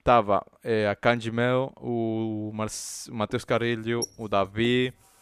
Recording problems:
household noises; noticeable; from 3.5 s on; 10 dB below the speech

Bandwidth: 14.5 kHz